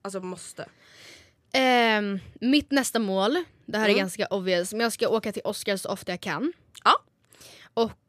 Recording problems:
none

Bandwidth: 15 kHz